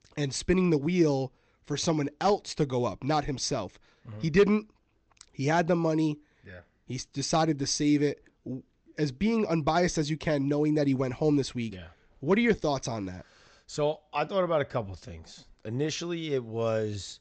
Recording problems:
high frequencies cut off; noticeable; nothing above 8 kHz

